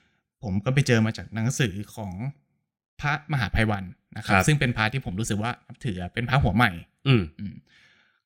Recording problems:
none

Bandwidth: 16 kHz